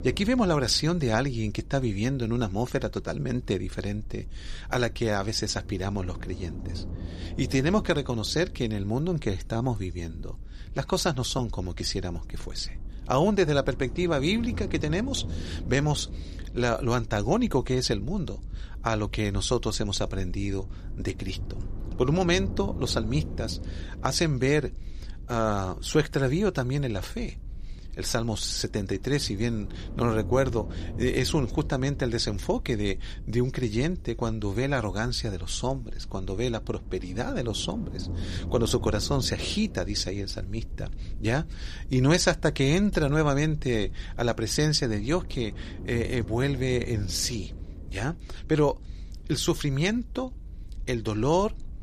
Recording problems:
low rumble; faint; throughout; 20 dB below the speech

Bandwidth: 14.5 kHz